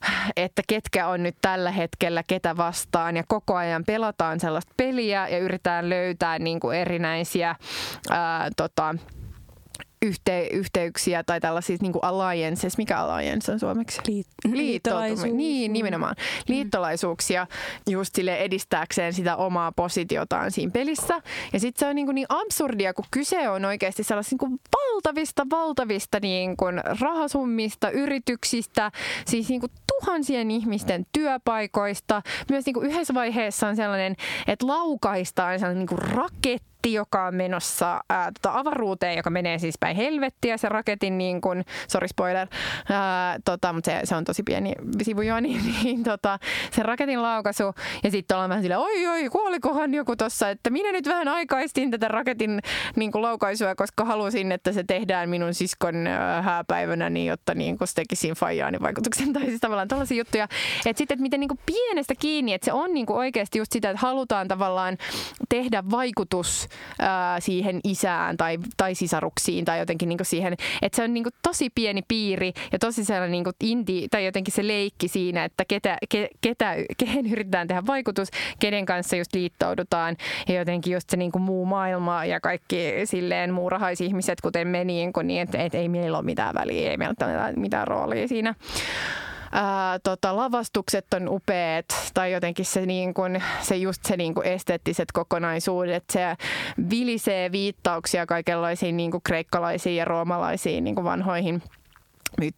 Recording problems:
squashed, flat; heavily

